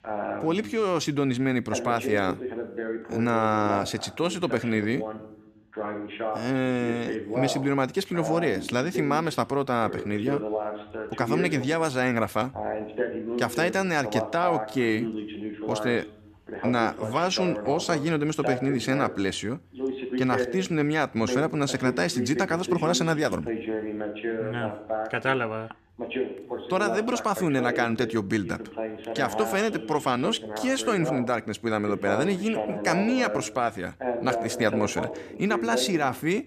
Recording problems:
voice in the background; loud; throughout; 6 dB below the speech

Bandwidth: 14.5 kHz